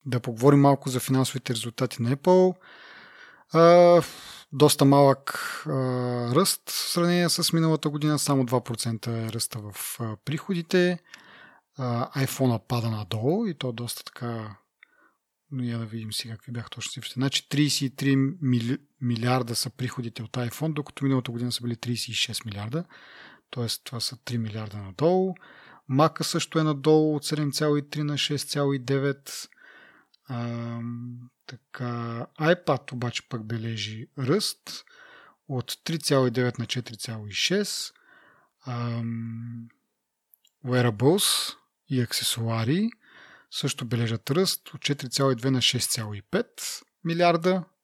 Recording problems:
none

